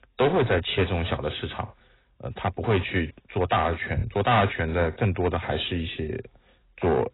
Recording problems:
distortion; heavy; 5% of the sound clipped
garbled, watery; badly; nothing above 4 kHz

